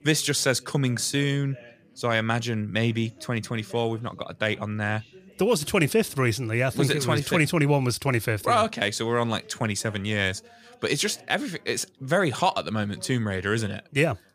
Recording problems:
background chatter; faint; throughout; 3 voices, 25 dB below the speech

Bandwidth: 14.5 kHz